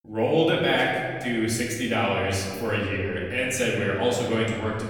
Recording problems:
off-mic speech; far
room echo; noticeable; dies away in 1.7 s

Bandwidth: 18 kHz